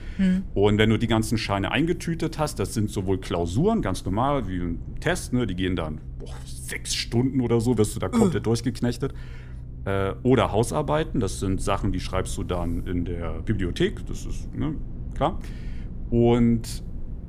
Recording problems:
low rumble; faint; throughout; 25 dB below the speech

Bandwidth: 15 kHz